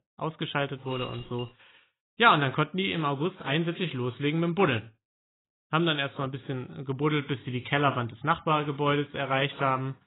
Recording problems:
garbled, watery; badly; nothing above 4 kHz
jangling keys; faint; at 1 s; peak 15 dB below the speech

